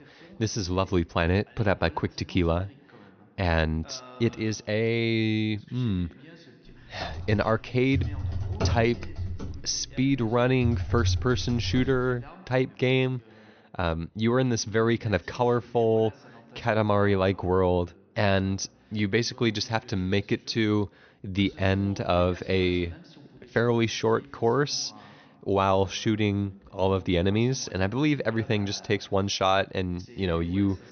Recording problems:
high frequencies cut off; noticeable; nothing above 6 kHz
voice in the background; faint; throughout; 25 dB below the speech
keyboard typing; noticeable; from 7 to 12 s; peak 2 dB below the speech

